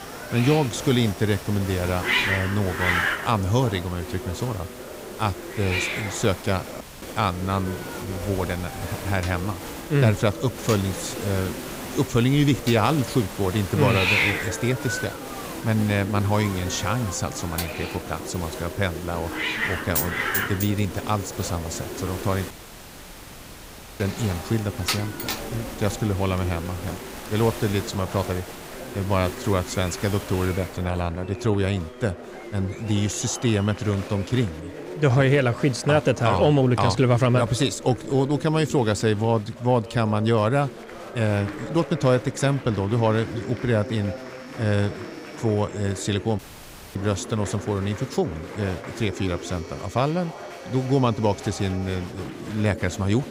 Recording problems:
hiss; loud; until 31 s; 6 dB below the speech
household noises; noticeable; throughout; 15 dB below the speech
chatter from many people; noticeable; throughout; 15 dB below the speech
audio cutting out; at 7 s, at 23 s for 1.5 s and at 46 s for 0.5 s

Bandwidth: 15.5 kHz